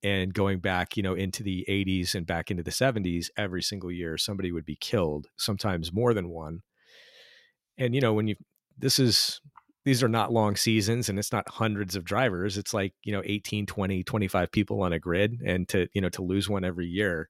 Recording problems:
none

